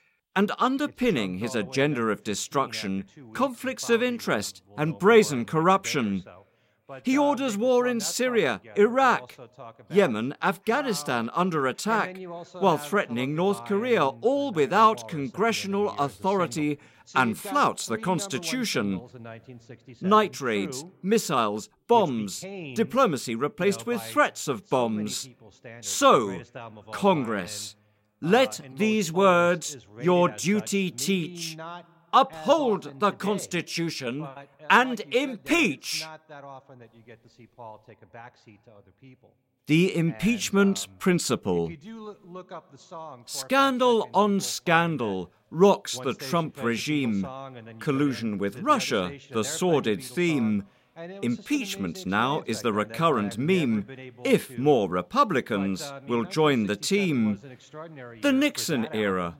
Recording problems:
voice in the background; noticeable; throughout; 20 dB below the speech

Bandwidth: 16 kHz